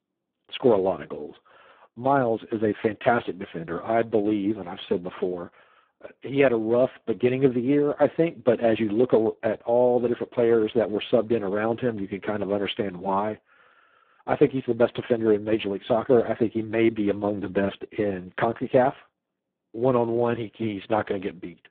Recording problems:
phone-call audio; poor line

